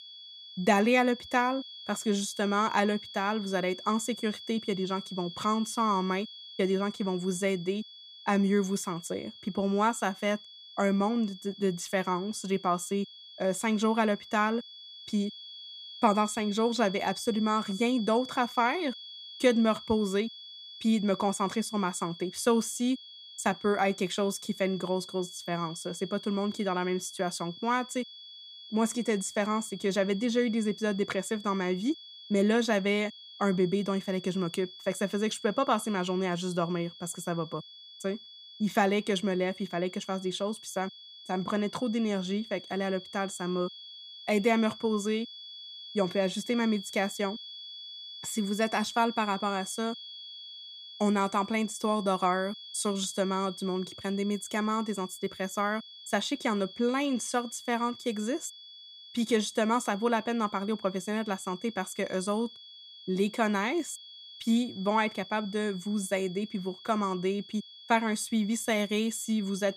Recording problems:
high-pitched whine; noticeable; throughout; 3.5 kHz, 15 dB below the speech

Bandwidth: 15 kHz